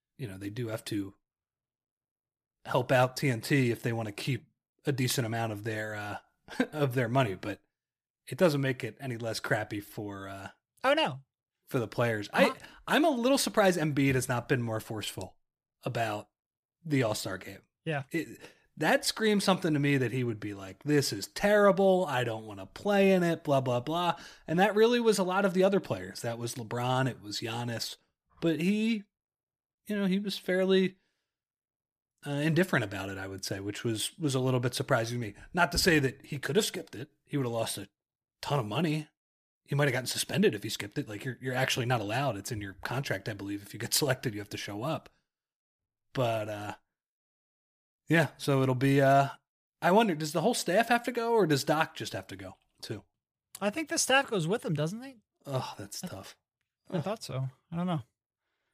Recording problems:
none

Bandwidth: 15 kHz